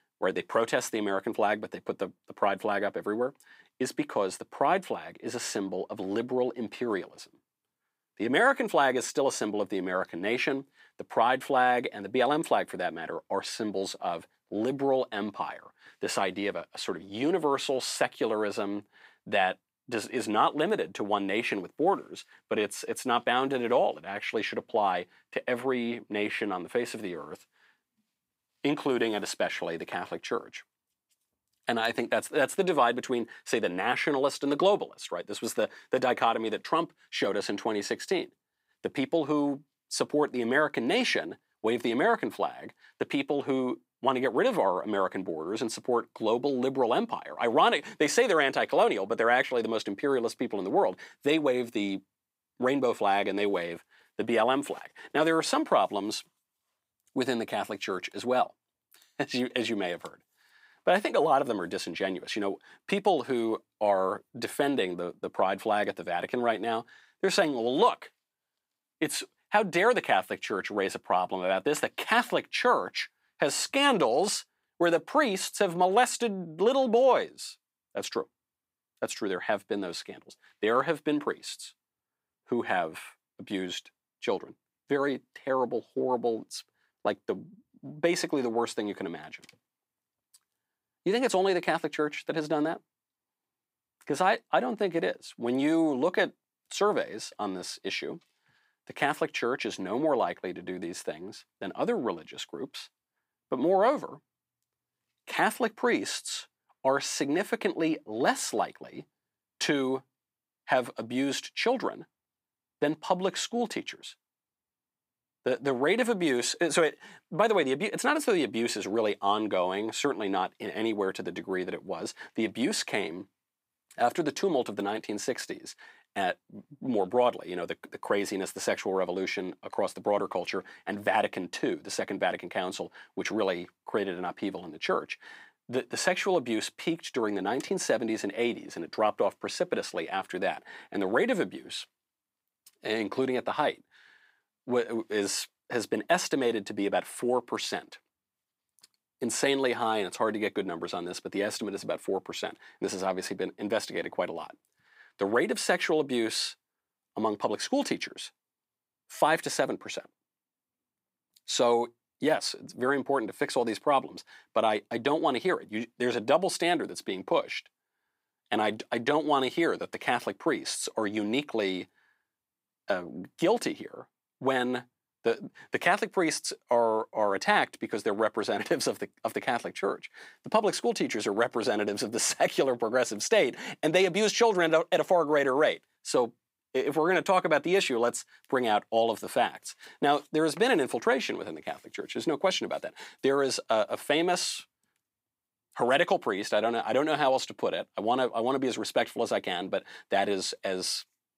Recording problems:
thin; somewhat; fading below 250 Hz

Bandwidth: 15.5 kHz